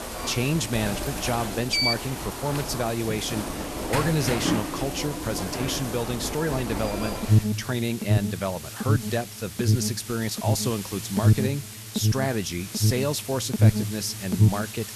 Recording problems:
alarms or sirens; very loud; throughout; 1 dB above the speech
hiss; loud; throughout; 9 dB below the speech

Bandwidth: 13.5 kHz